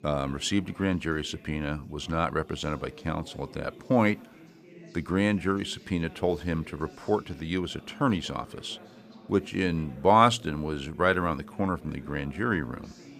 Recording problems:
background chatter; faint; throughout; 4 voices, 20 dB below the speech

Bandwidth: 15 kHz